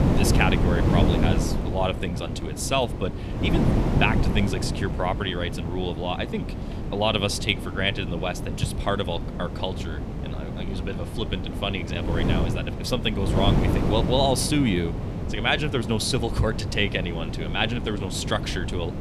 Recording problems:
wind noise on the microphone; heavy; 7 dB below the speech

